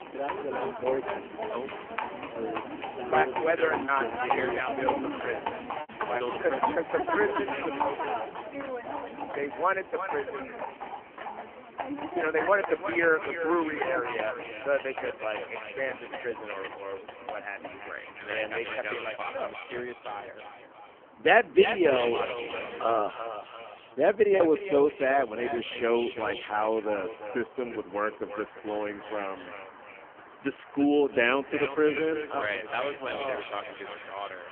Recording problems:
phone-call audio; poor line; nothing above 3 kHz
echo of what is said; strong; from 7 s on; 340 ms later, 9 dB below the speech
animal sounds; loud; throughout; 6 dB below the speech
traffic noise; faint; throughout; 20 dB below the speech
choppy; occasionally; from 3 to 6 s and at 24 s; 3% of the speech affected

